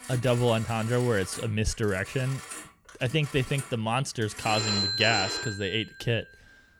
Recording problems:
alarms or sirens; loud; throughout; 5 dB below the speech

